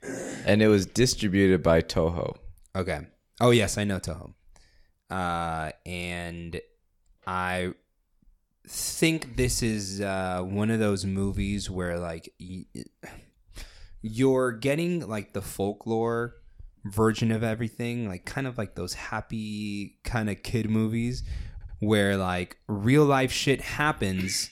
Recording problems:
audio stuttering; at 22 s

